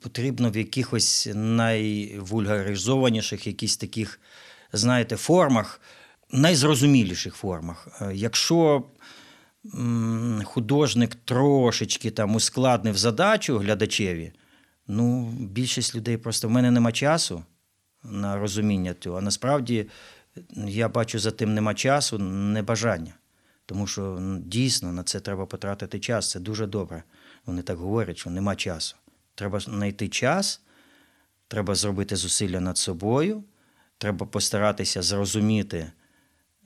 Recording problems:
none

